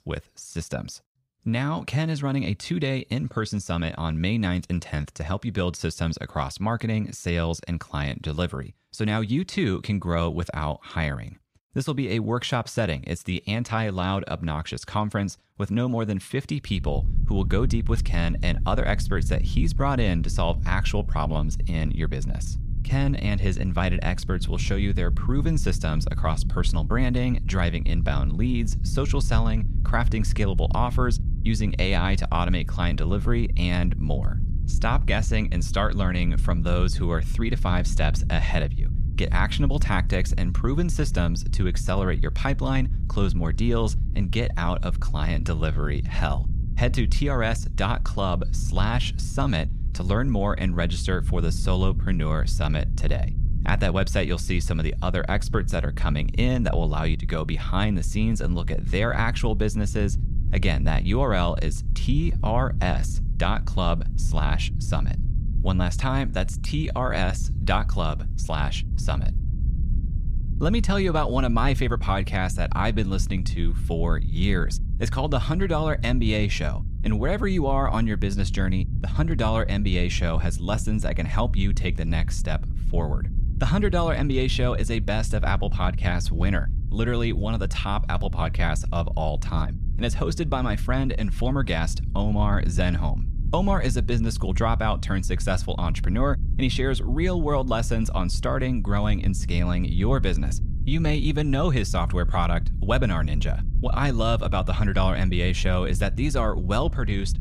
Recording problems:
low rumble; noticeable; from 17 s on; 15 dB below the speech

